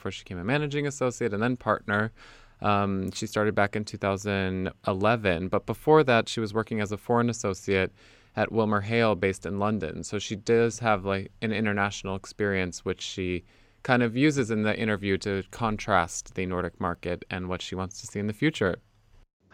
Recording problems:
none

